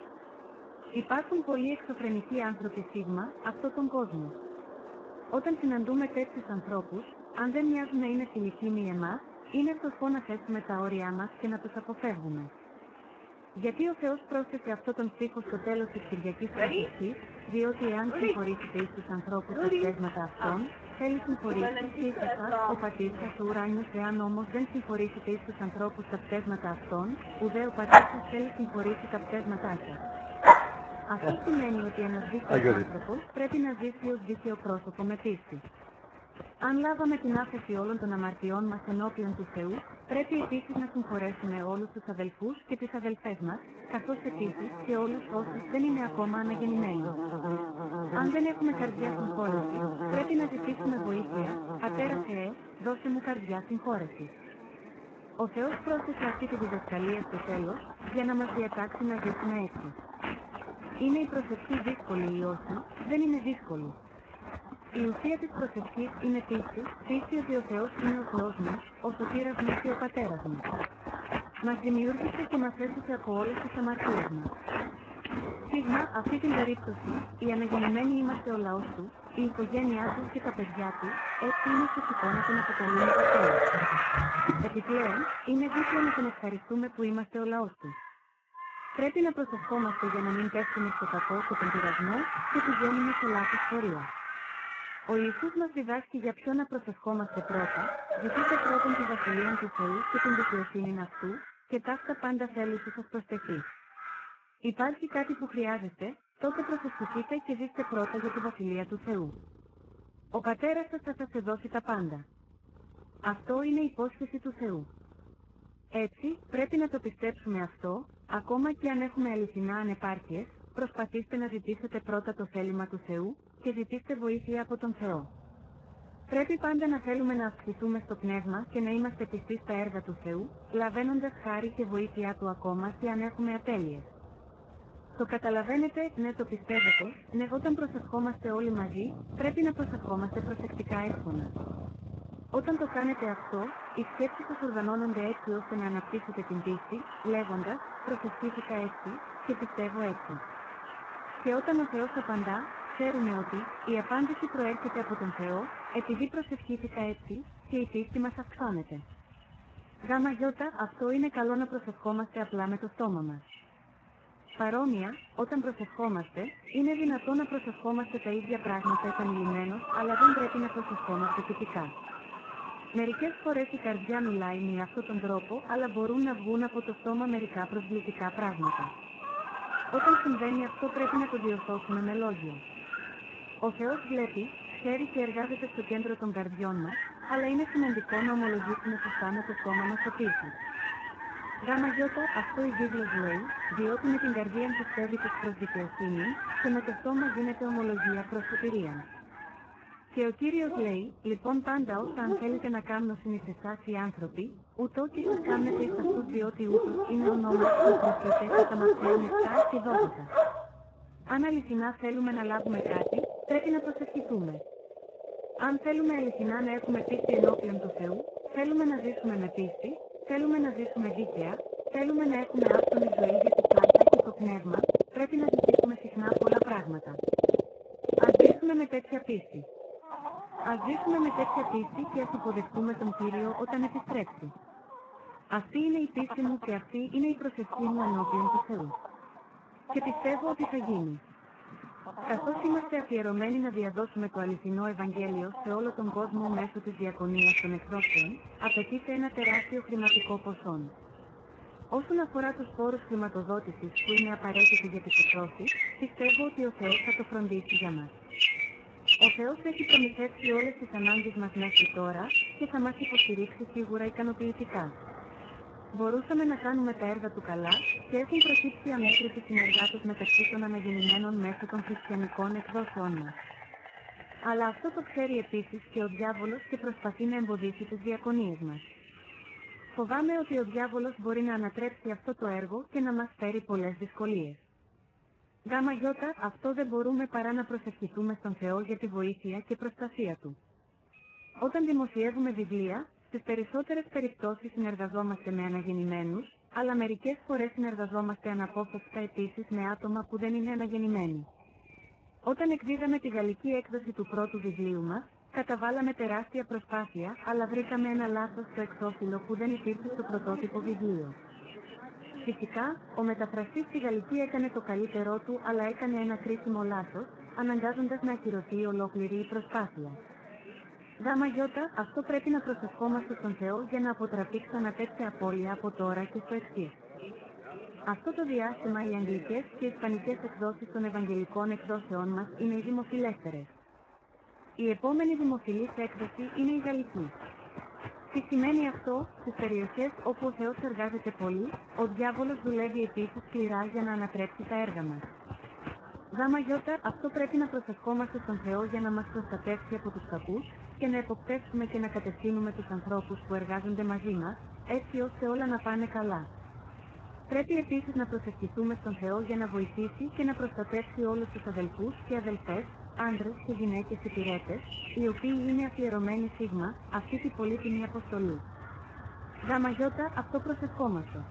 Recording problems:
garbled, watery; badly
animal sounds; very loud; throughout; 3 dB above the speech

